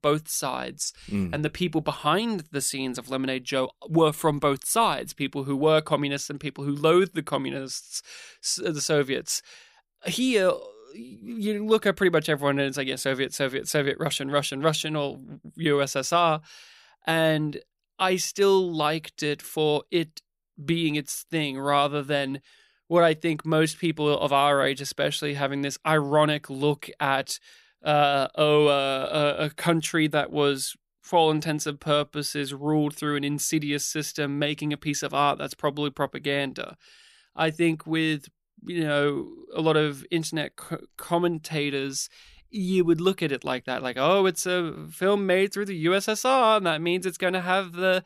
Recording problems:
none

